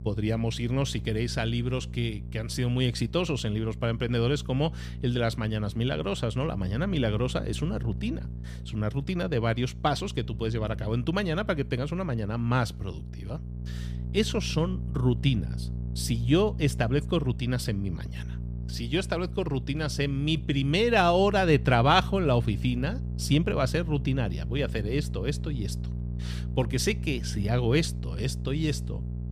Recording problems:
electrical hum; noticeable; throughout; 60 Hz, 20 dB below the speech

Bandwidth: 15 kHz